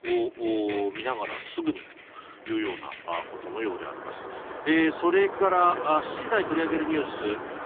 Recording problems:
phone-call audio; poor line; nothing above 3.5 kHz
traffic noise; loud; throughout; 10 dB below the speech

